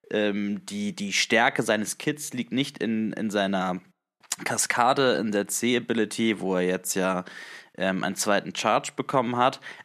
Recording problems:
none

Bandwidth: 13.5 kHz